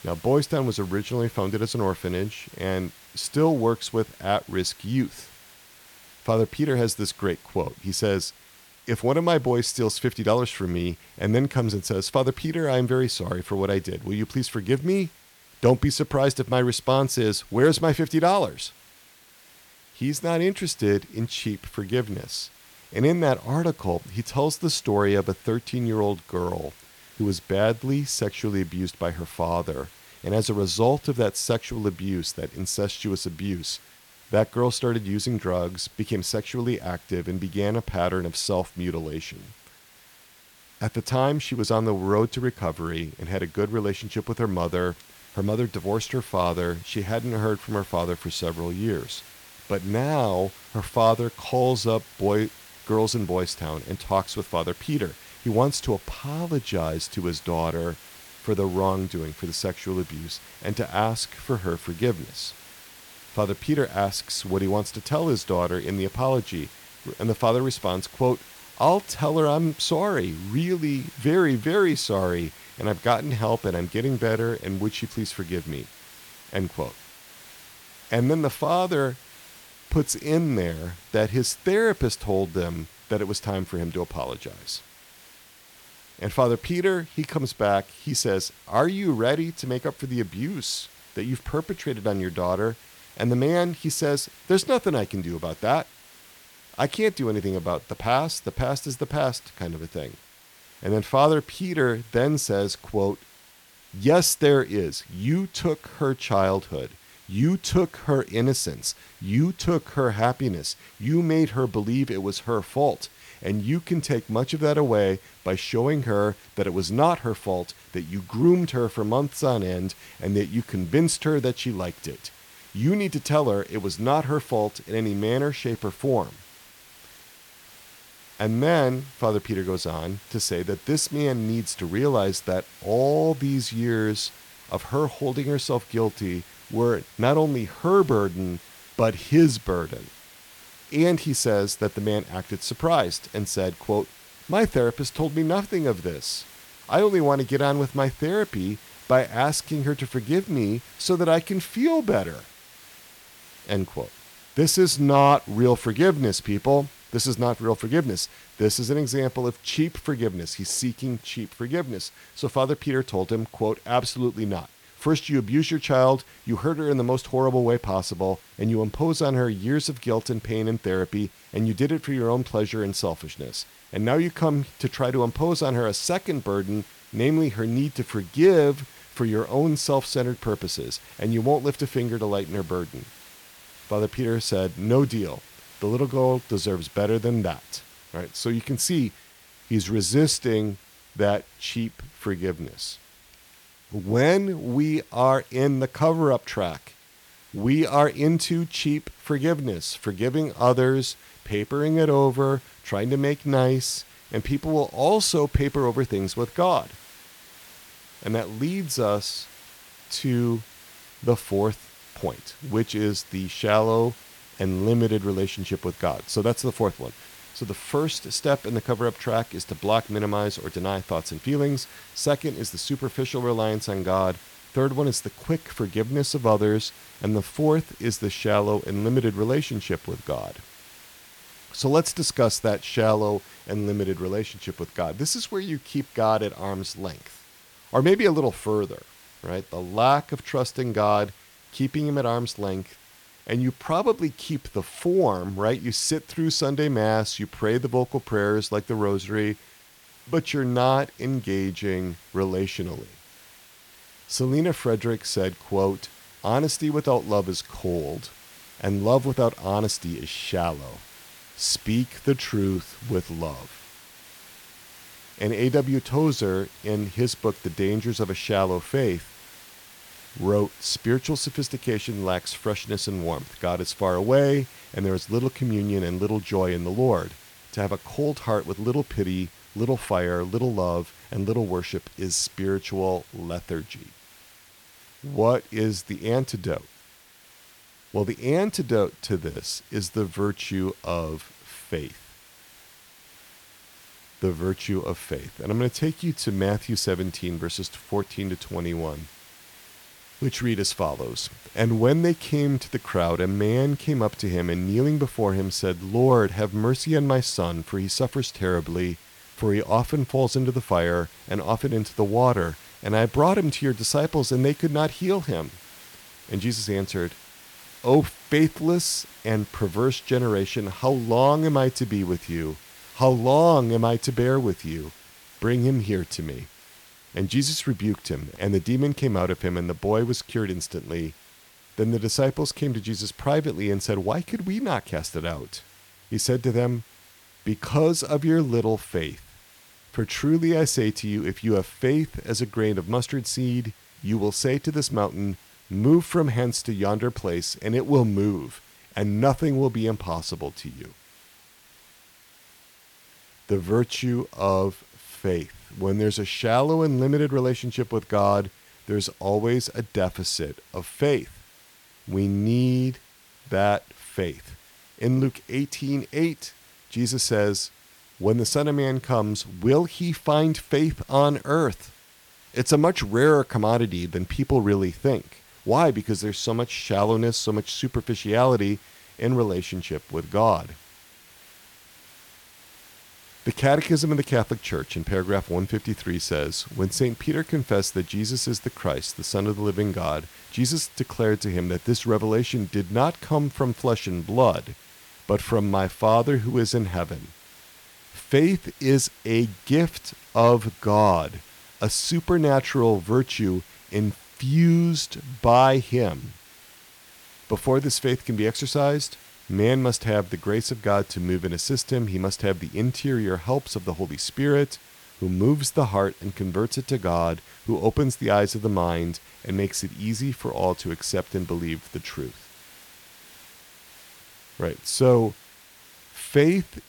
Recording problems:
hiss; faint; throughout; 25 dB below the speech

